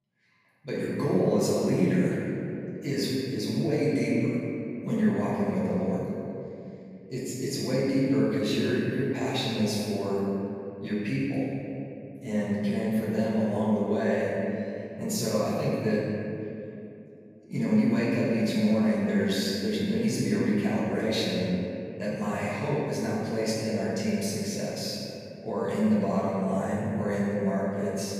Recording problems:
room echo; strong; dies away in 2.6 s
off-mic speech; far

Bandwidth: 15 kHz